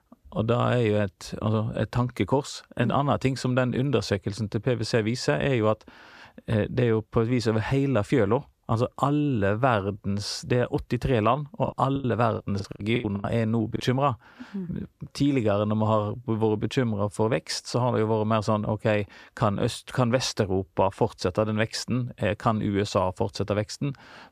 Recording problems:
choppy; very; from 12 to 14 s; 21% of the speech affected

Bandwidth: 14.5 kHz